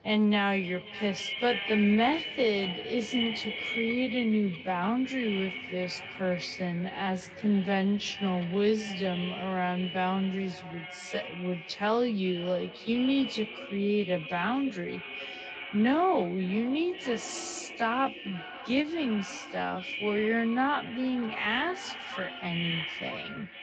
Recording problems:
echo of what is said; strong; throughout; 530 ms later, 8 dB below the speech
wrong speed, natural pitch; too slow; 0.5 times normal speed
garbled, watery; slightly; nothing above 8 kHz
animal sounds; faint; throughout; 20 dB below the speech

